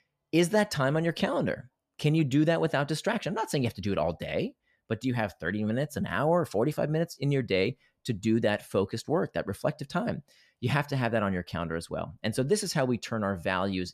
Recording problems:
none

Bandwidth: 14.5 kHz